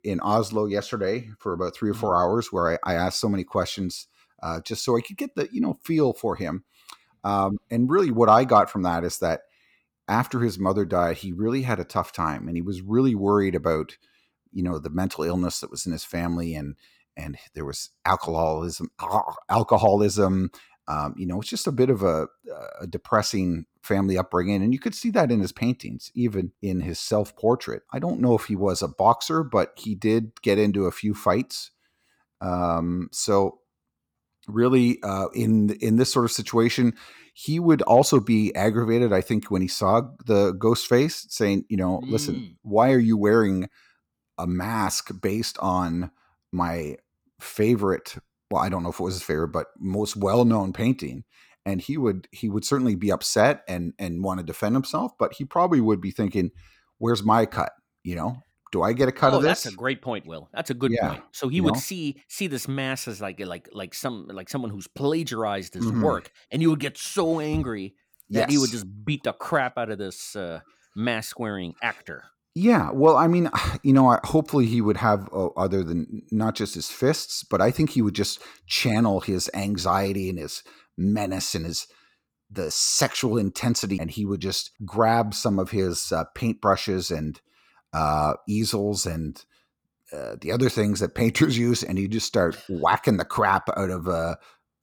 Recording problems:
none

